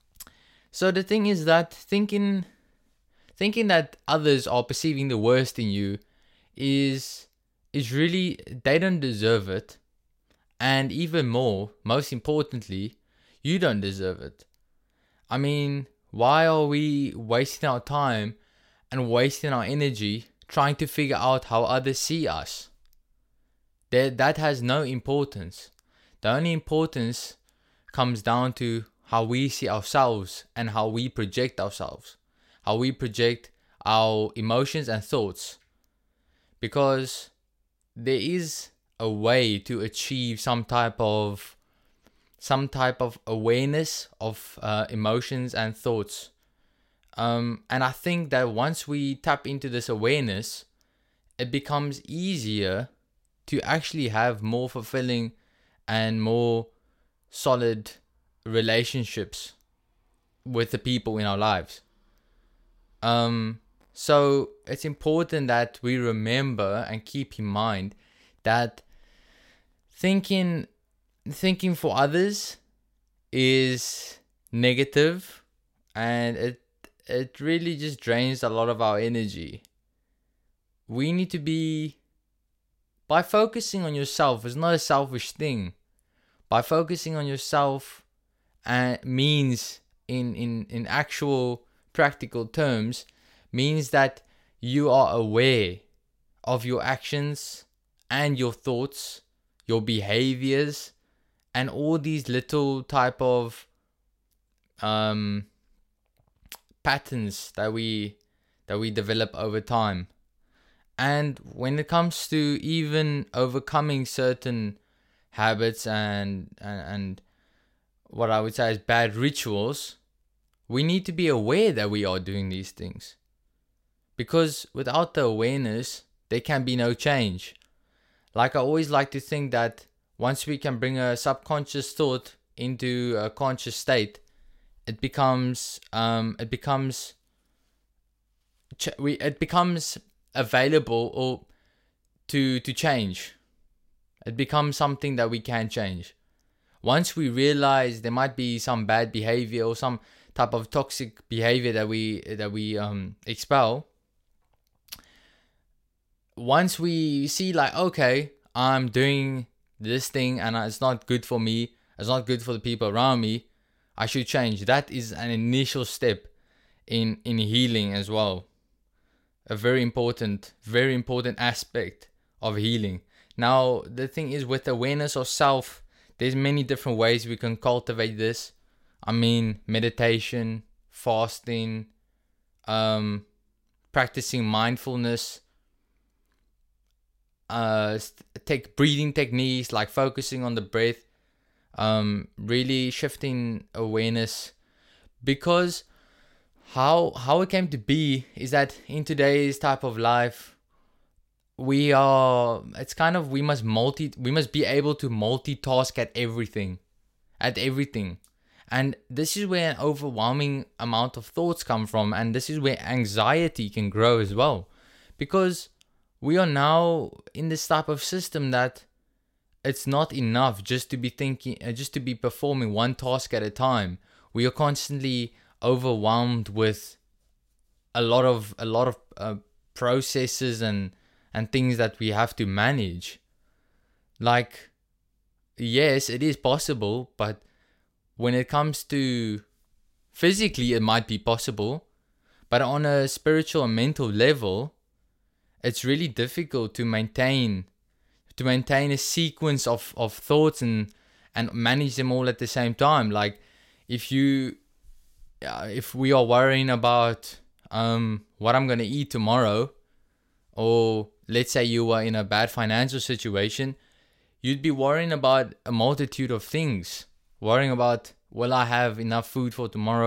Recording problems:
abrupt cut into speech; at the end

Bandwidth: 16 kHz